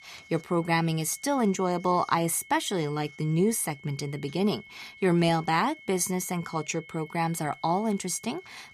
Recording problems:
high-pitched whine; faint; throughout; 2 kHz, 20 dB below the speech

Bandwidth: 14.5 kHz